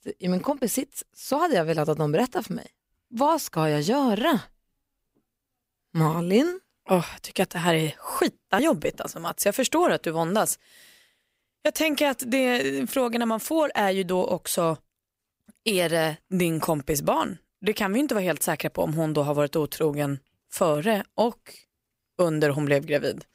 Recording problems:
none

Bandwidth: 15.5 kHz